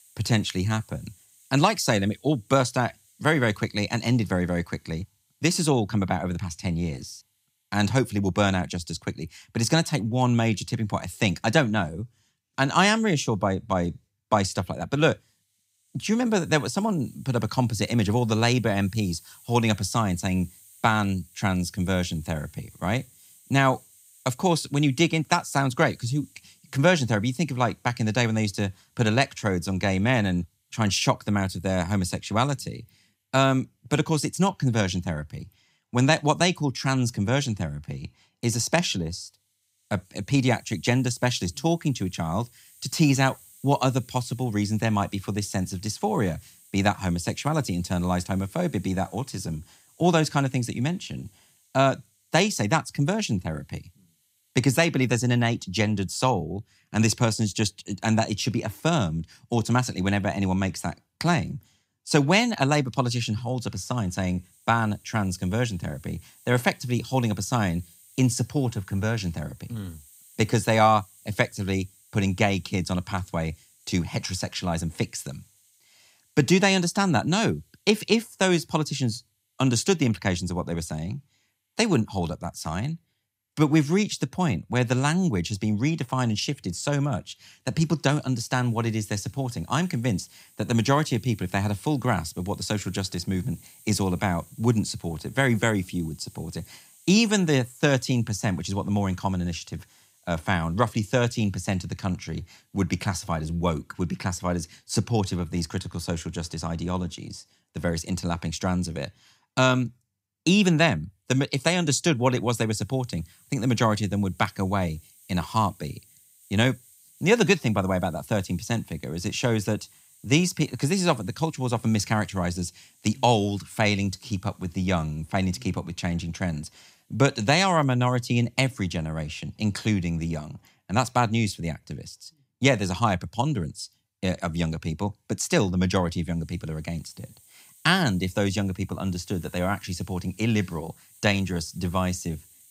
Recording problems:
hiss; faint; throughout; 30 dB below the speech

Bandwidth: 15.5 kHz